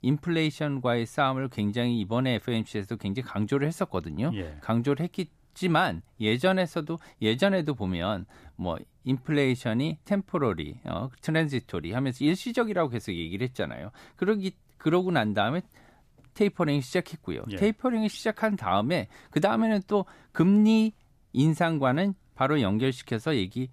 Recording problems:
none

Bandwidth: 14.5 kHz